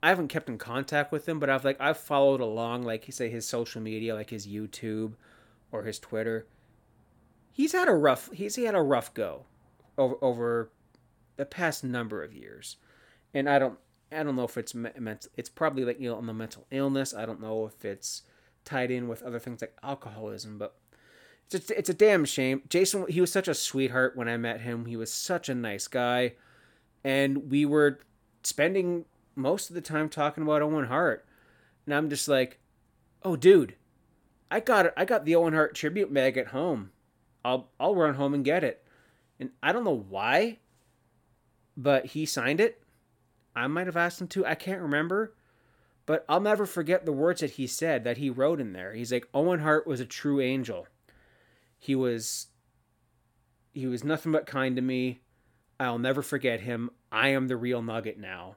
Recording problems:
none

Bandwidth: 18 kHz